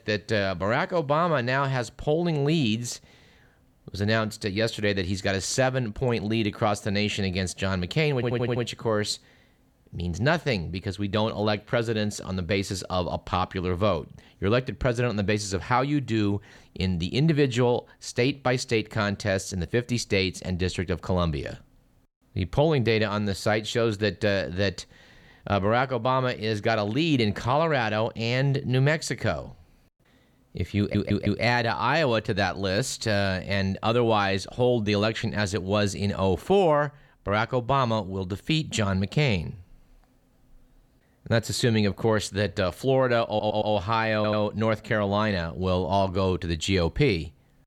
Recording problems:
audio stuttering; 4 times, first at 8 s

